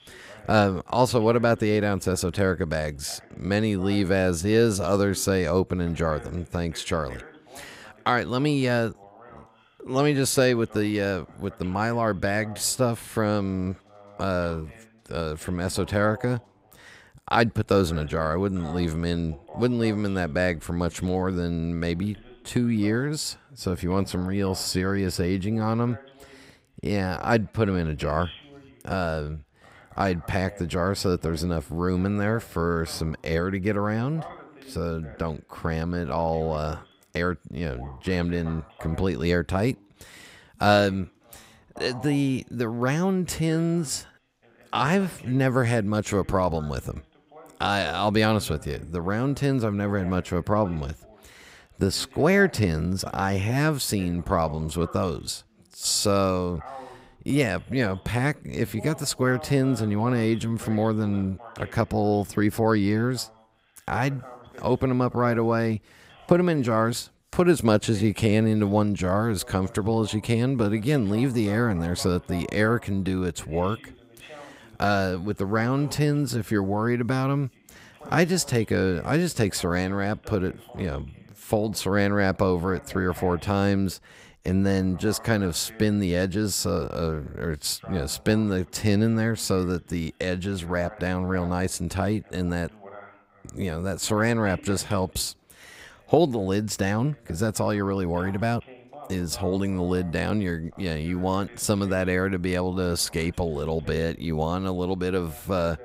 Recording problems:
voice in the background; faint; throughout; 20 dB below the speech

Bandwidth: 15.5 kHz